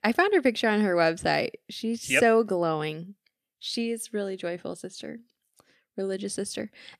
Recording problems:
none

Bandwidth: 14.5 kHz